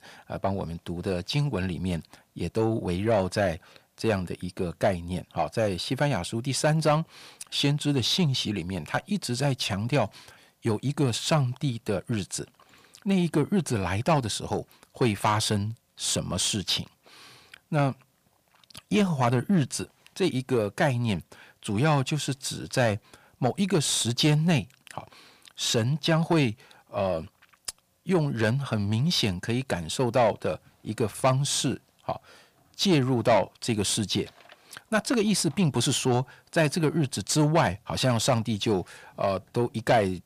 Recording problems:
distortion; slight; 10 dB below the speech

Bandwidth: 15 kHz